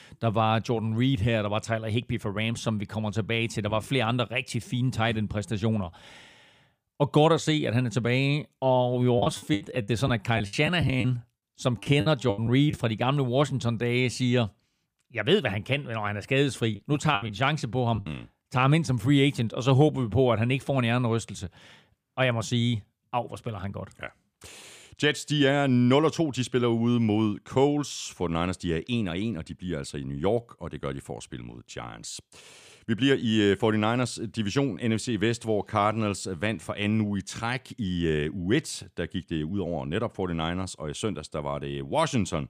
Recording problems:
choppy; very; from 9 to 13 s and from 17 to 18 s; 15% of the speech affected

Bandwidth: 15 kHz